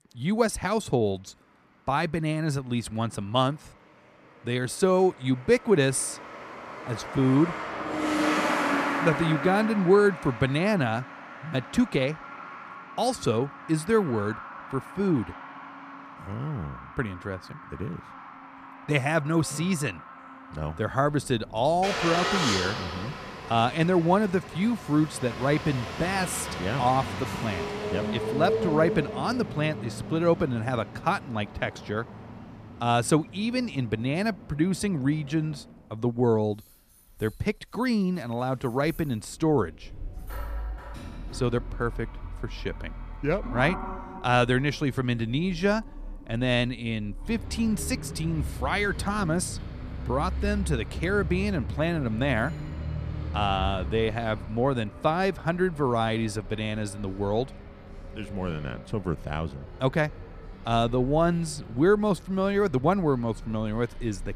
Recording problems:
traffic noise; loud; throughout; 9 dB below the speech

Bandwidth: 14.5 kHz